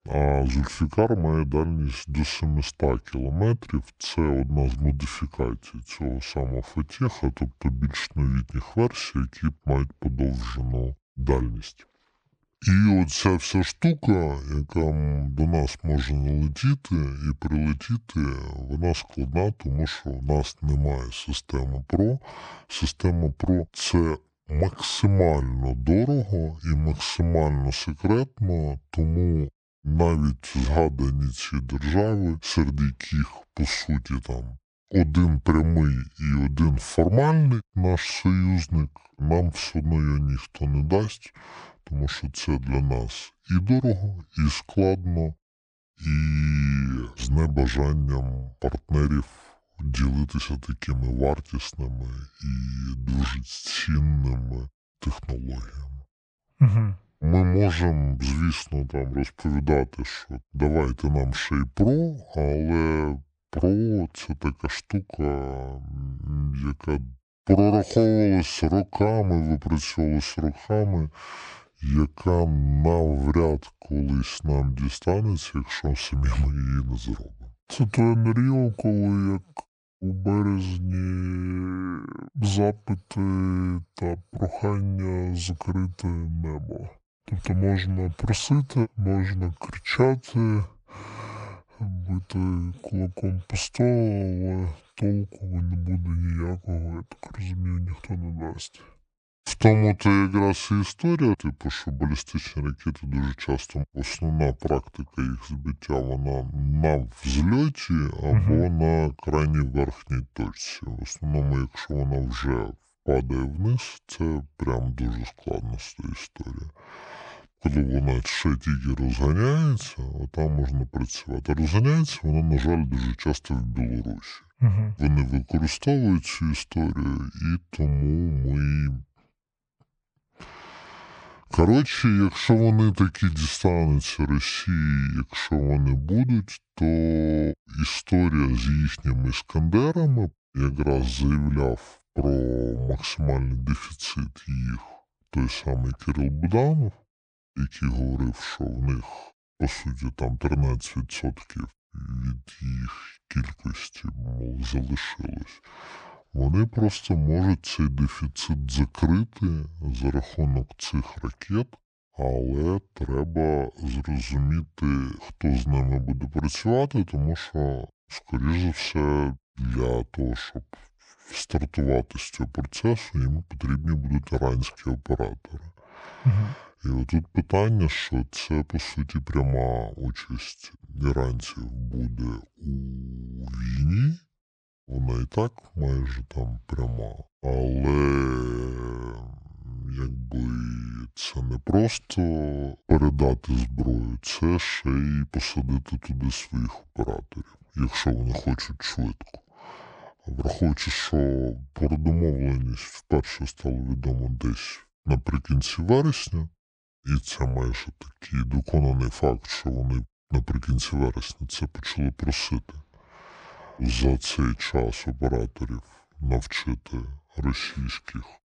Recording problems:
wrong speed and pitch; too slow and too low; 0.6 times normal speed

